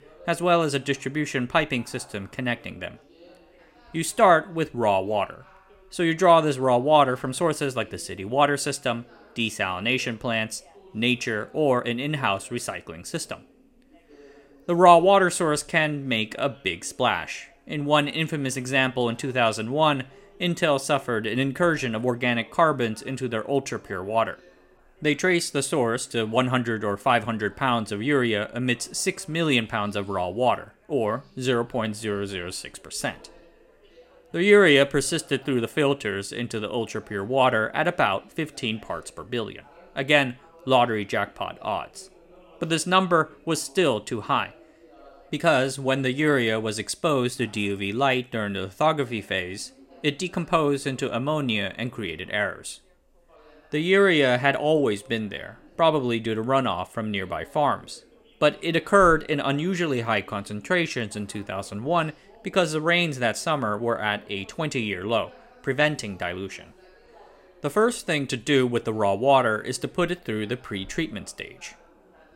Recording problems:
background chatter; faint; throughout; 3 voices, 30 dB below the speech

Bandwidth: 16 kHz